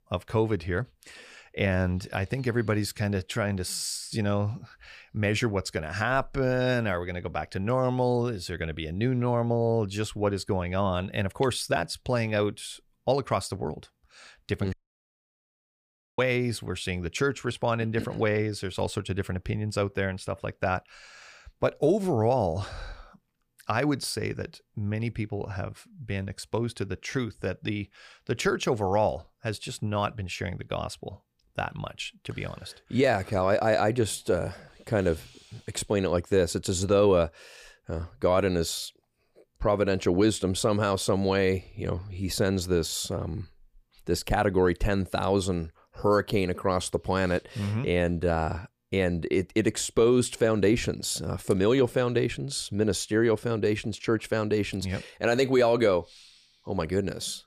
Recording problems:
audio cutting out; at 15 s for 1.5 s

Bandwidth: 15 kHz